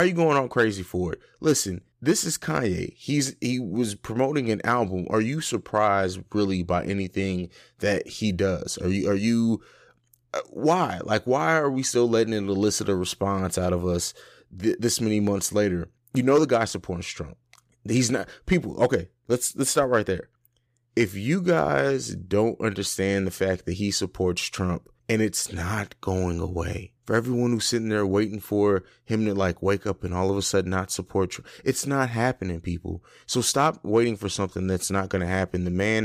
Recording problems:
abrupt cut into speech; at the start and the end

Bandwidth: 15 kHz